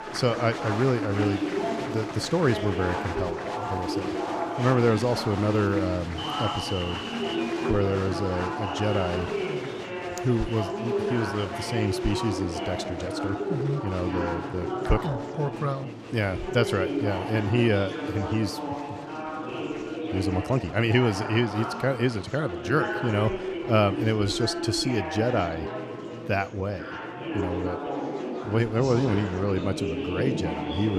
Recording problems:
murmuring crowd; loud; throughout; 4 dB below the speech
uneven, jittery; strongly; from 1.5 to 28 s
abrupt cut into speech; at the end

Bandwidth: 14.5 kHz